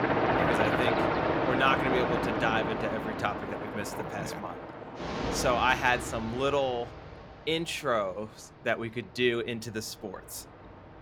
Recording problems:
train or aircraft noise; loud; throughout; as loud as the speech

